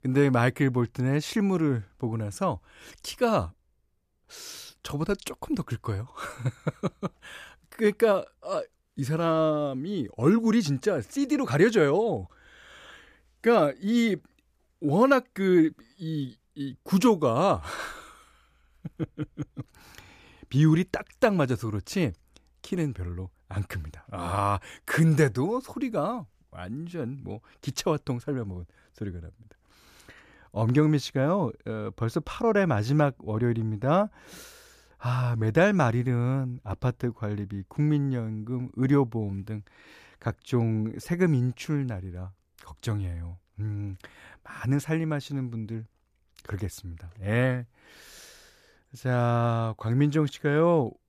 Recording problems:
none

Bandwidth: 14.5 kHz